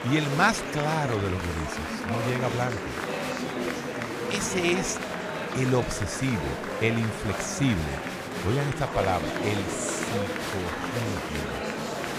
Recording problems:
murmuring crowd; loud; throughout; 2 dB below the speech

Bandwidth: 15 kHz